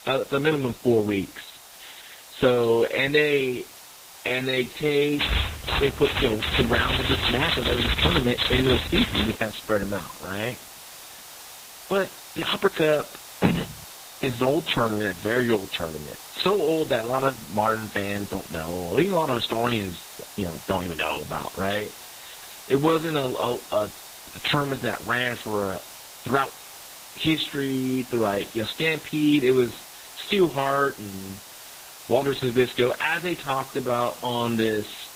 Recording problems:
garbled, watery; badly; nothing above 4 kHz
hiss; noticeable; throughout; 15 dB below the speech
high-pitched whine; faint; throughout; 3.5 kHz, 30 dB below the speech
uneven, jittery; strongly; from 1 to 34 s
keyboard typing; loud; from 5 to 9.5 s; peak 2 dB above the speech
phone ringing; loud; at 13 s; peak 1 dB above the speech

